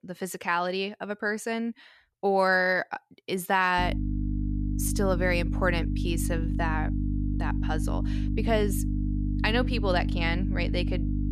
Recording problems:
electrical hum; noticeable; from 4 s on; 50 Hz, 10 dB below the speech

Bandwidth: 14 kHz